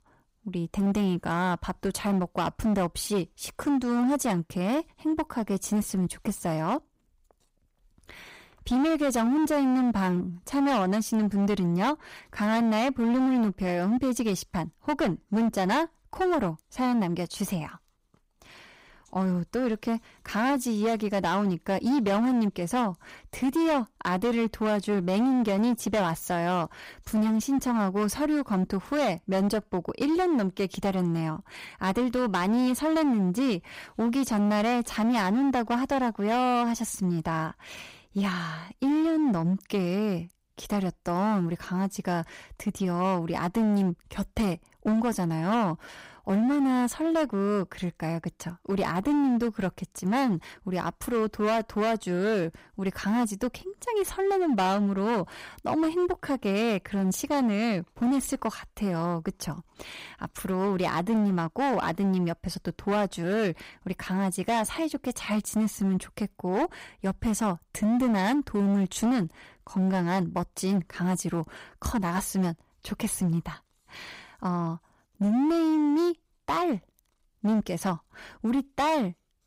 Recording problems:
distortion; slight; 14% of the sound clipped

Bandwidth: 15.5 kHz